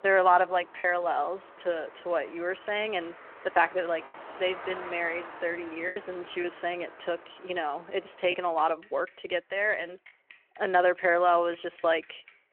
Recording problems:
phone-call audio
traffic noise; noticeable; throughout; 20 dB below the speech
choppy; occasionally; 2% of the speech affected

